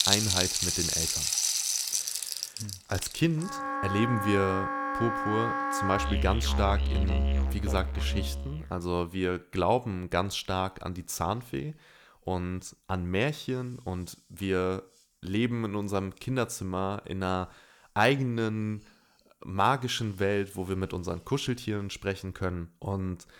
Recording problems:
background music; very loud; until 8.5 s; 2 dB above the speech

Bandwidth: 19 kHz